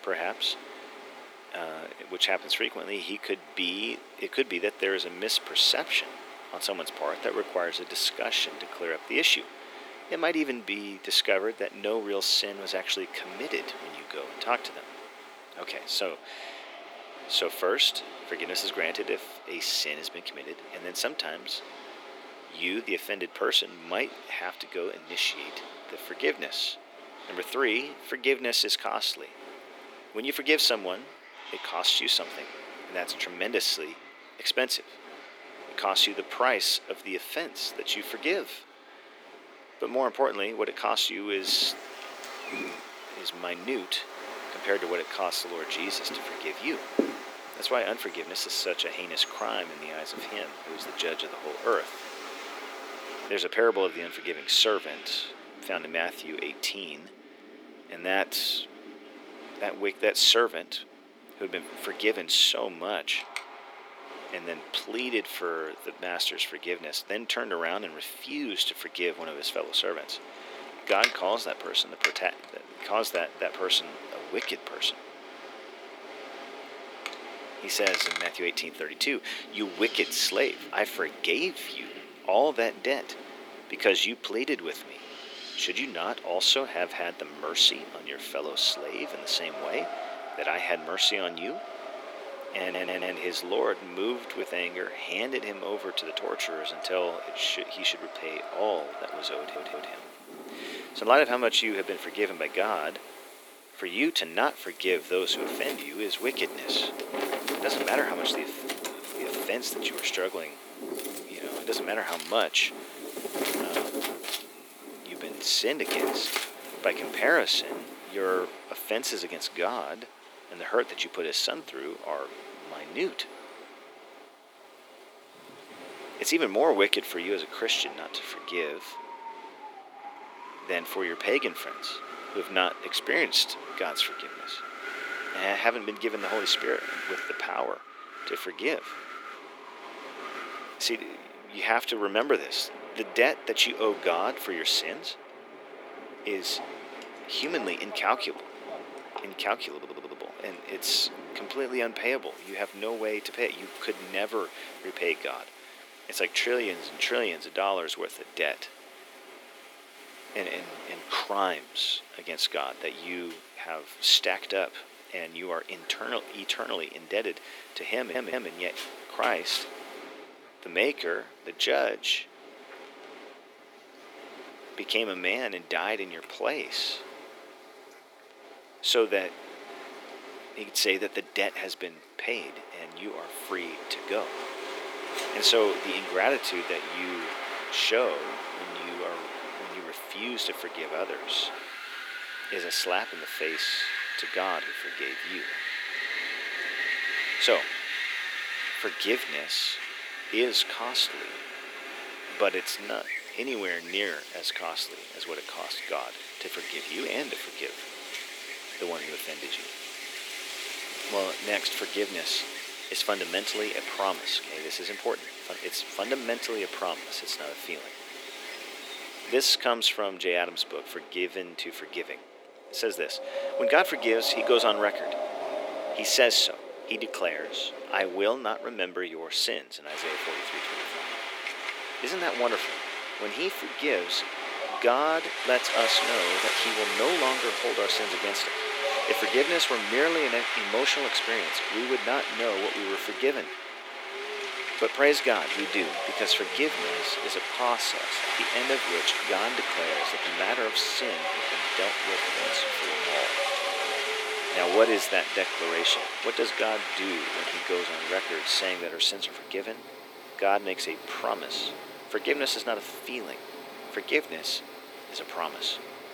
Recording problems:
thin; somewhat; fading below 300 Hz
wind in the background; loud; throughout; 6 dB below the speech
animal sounds; faint; throughout; 25 dB below the speech
audio stuttering; 4 times, first at 1:33

